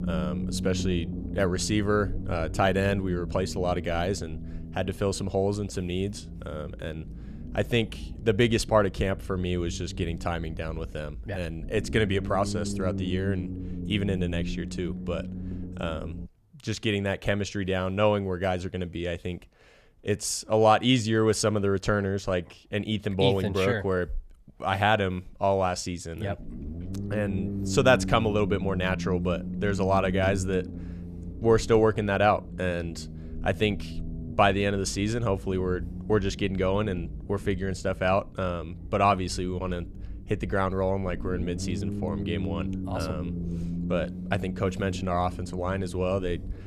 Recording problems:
low rumble; noticeable; until 16 s and from 26 s on; 15 dB below the speech

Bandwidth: 14.5 kHz